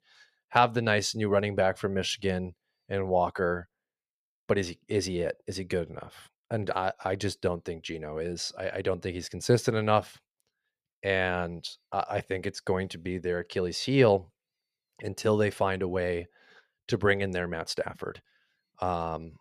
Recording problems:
none

